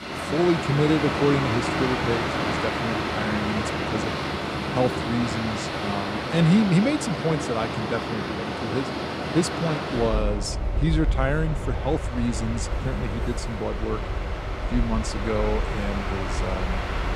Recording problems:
train or aircraft noise; loud; throughout; 1 dB below the speech

